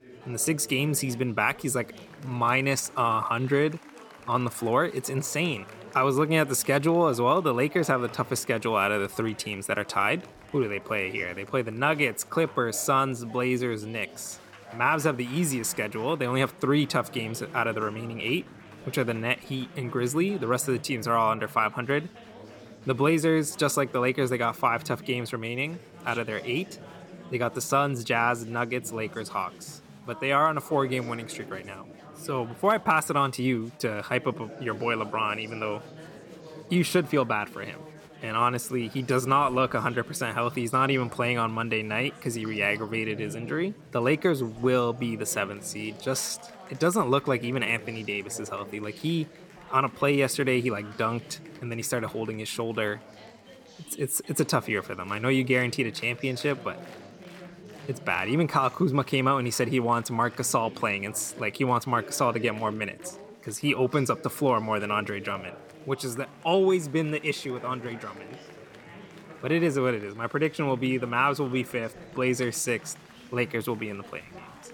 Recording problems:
chatter from many people; noticeable; throughout; 20 dB below the speech

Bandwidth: 18 kHz